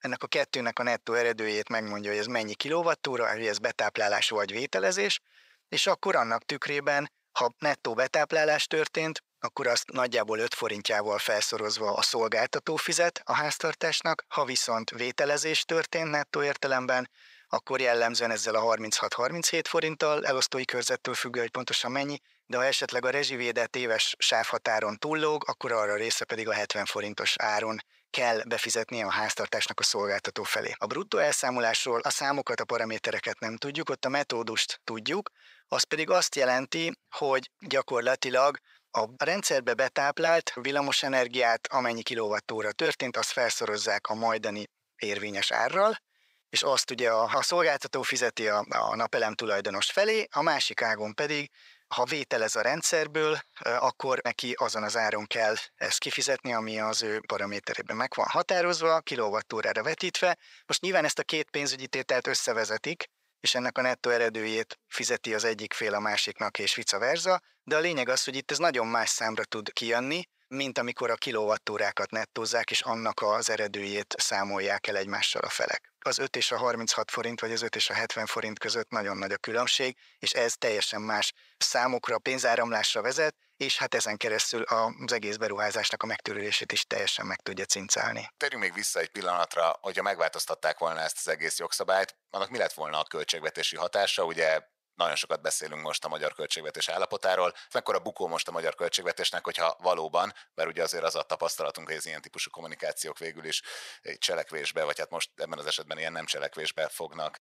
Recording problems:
thin; very; fading below 650 Hz

